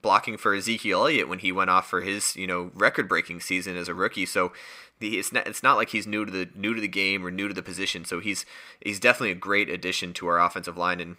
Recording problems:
thin; very slightly; fading below 350 Hz

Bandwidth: 15.5 kHz